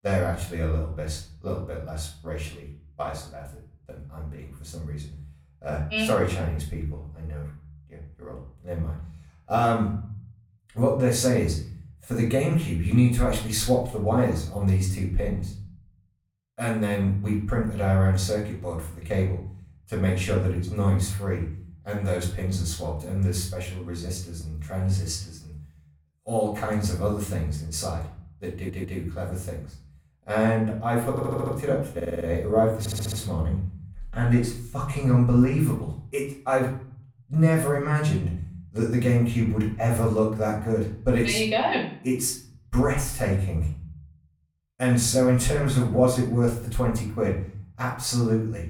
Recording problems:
off-mic speech; far
room echo; slight; dies away in 0.5 s
audio stuttering; 4 times, first at 29 s

